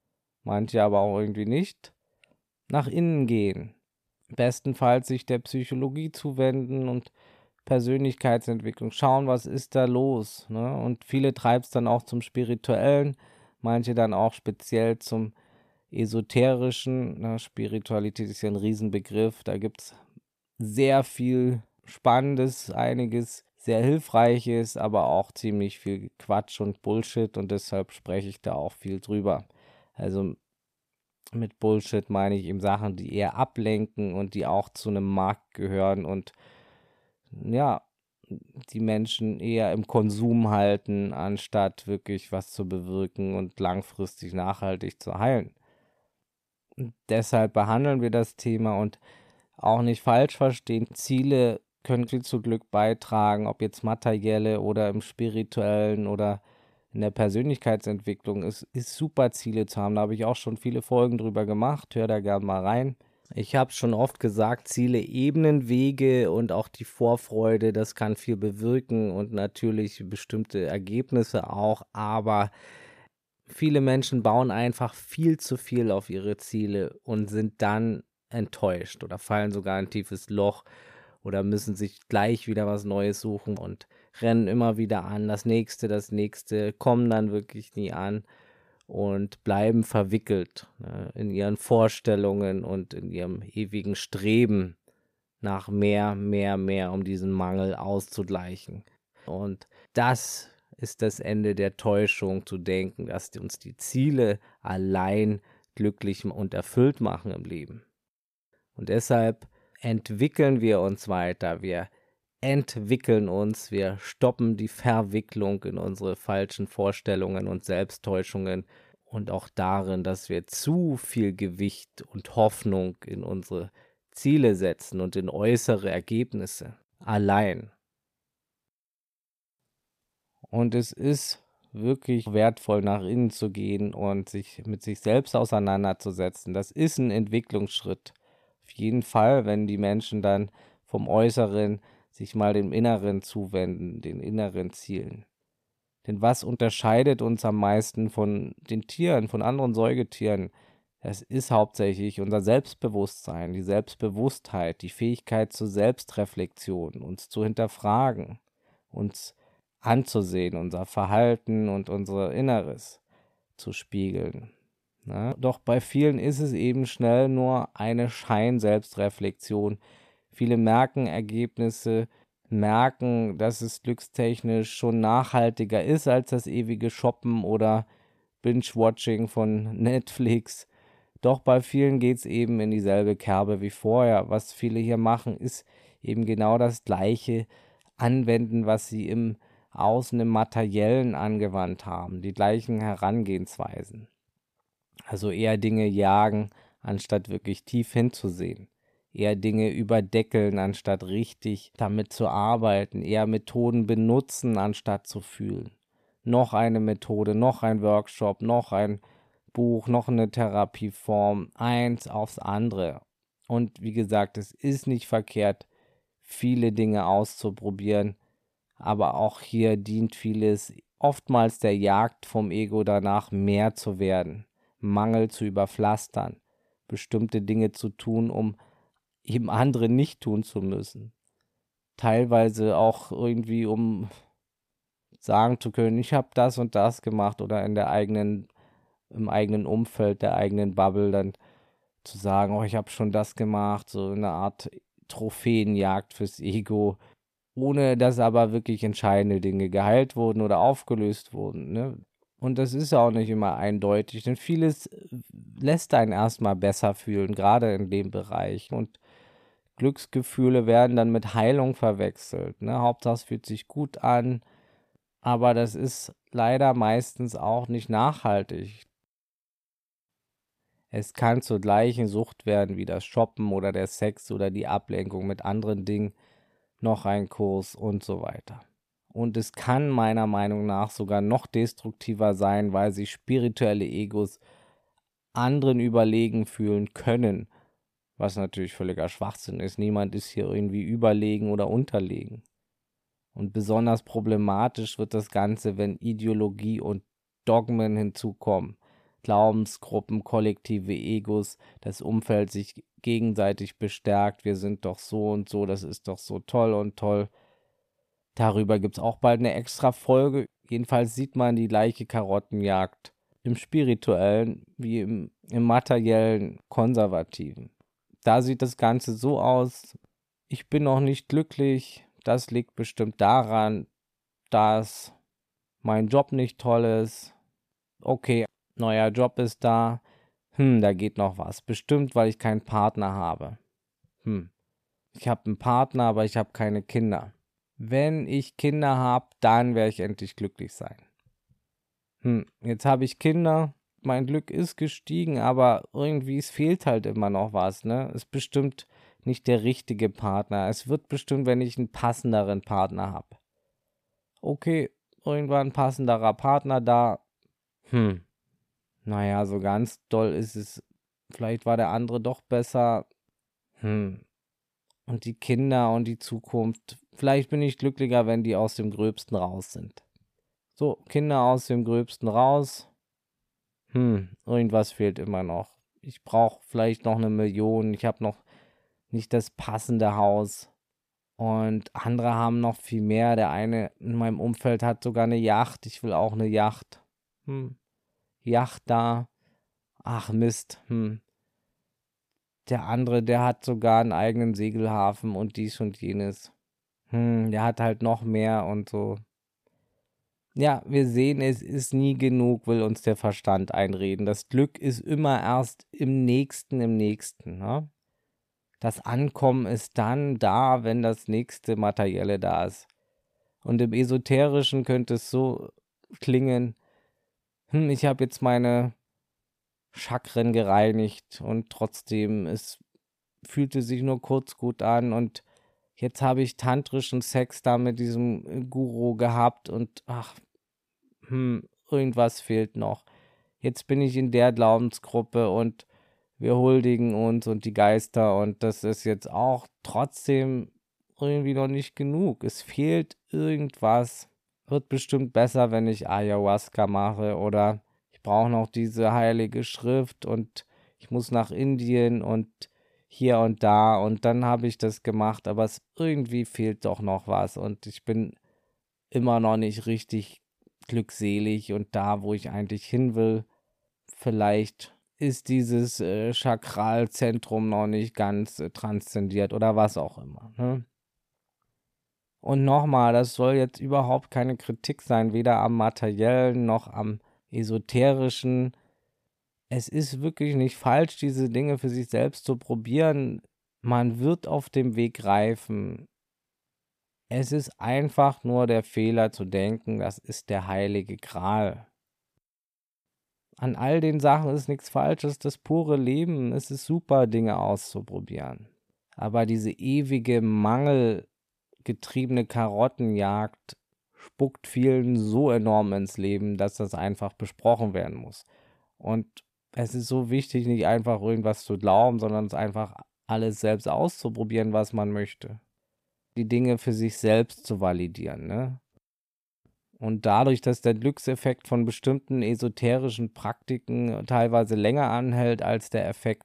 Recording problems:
none

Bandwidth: 14.5 kHz